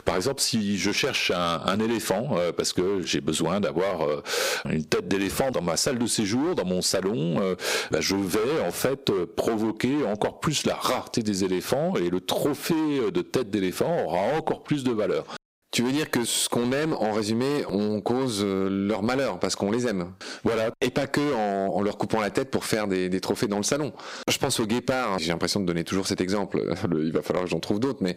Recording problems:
distortion; heavy; 9% of the sound clipped
squashed, flat; somewhat

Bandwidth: 15.5 kHz